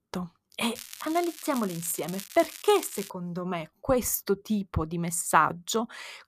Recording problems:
crackling; noticeable; from 1 to 3 s; 15 dB below the speech

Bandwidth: 14.5 kHz